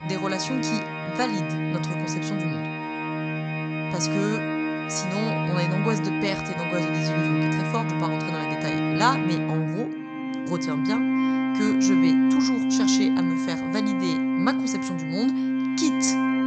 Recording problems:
high frequencies cut off; noticeable; nothing above 8 kHz
background music; very loud; throughout; 4 dB above the speech

